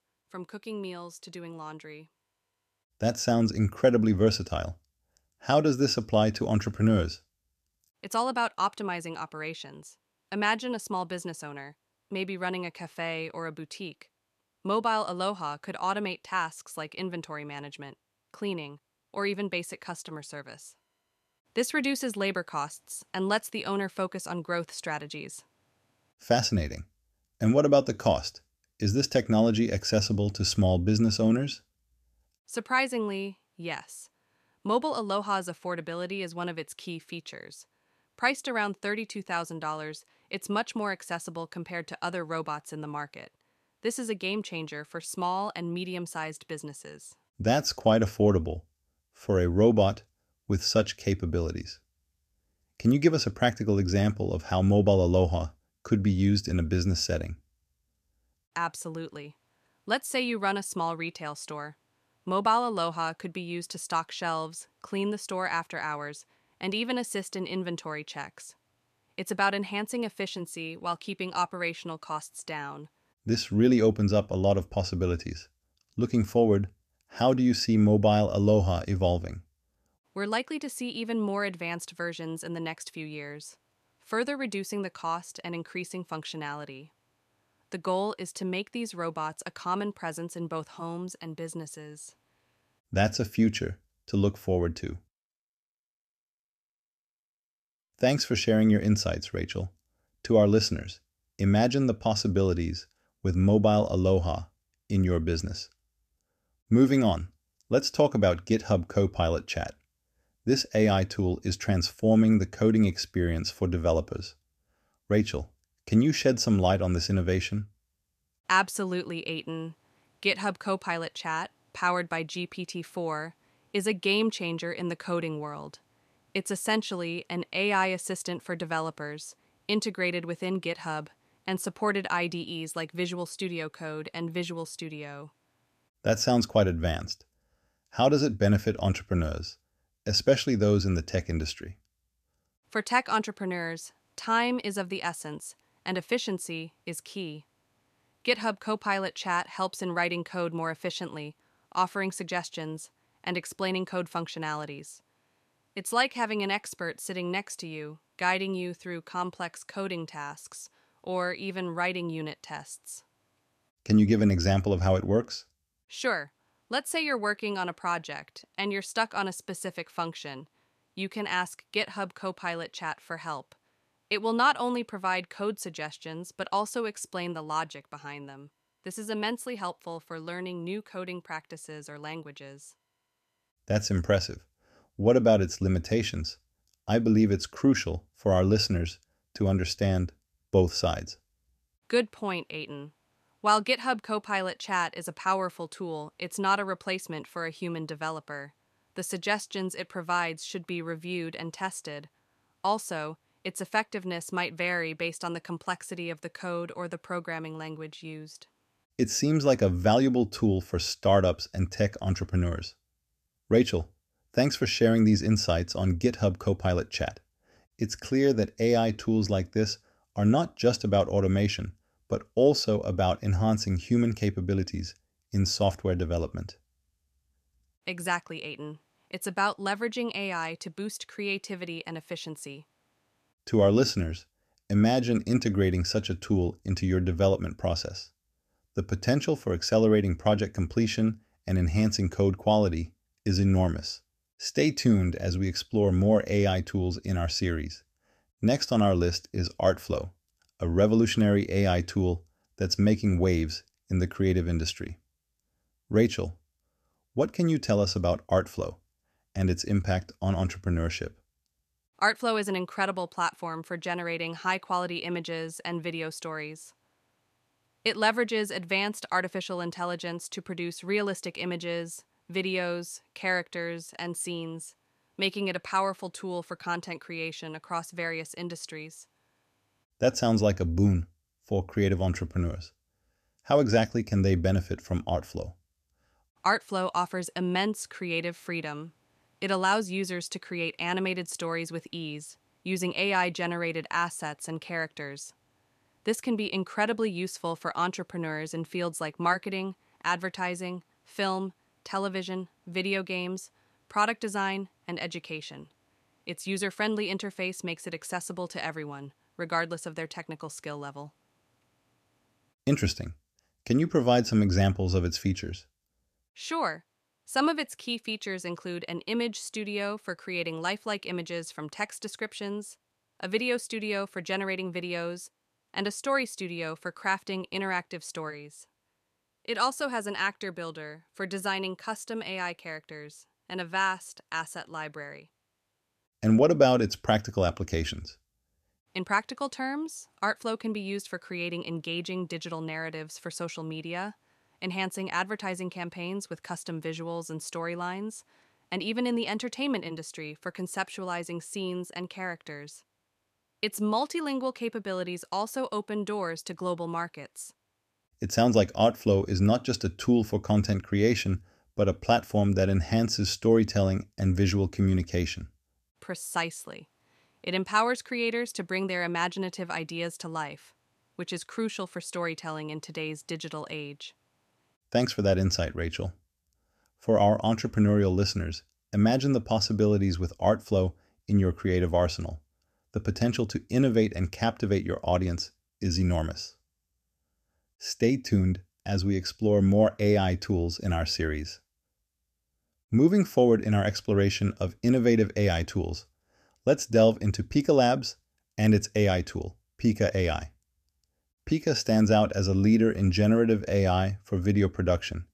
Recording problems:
none

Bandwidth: 14.5 kHz